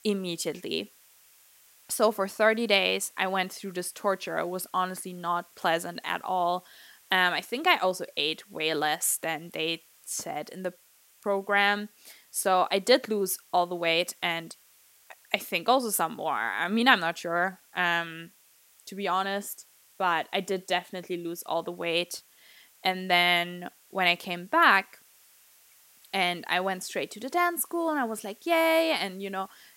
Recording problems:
hiss; faint; throughout; 30 dB below the speech

